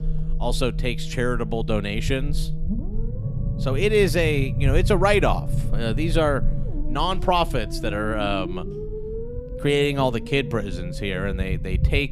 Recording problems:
low rumble; noticeable; throughout; 15 dB below the speech

